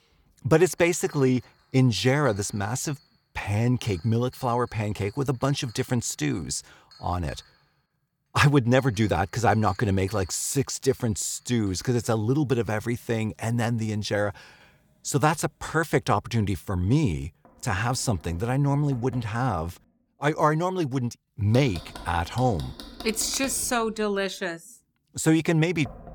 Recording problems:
household noises; faint; throughout; 20 dB below the speech

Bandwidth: 18.5 kHz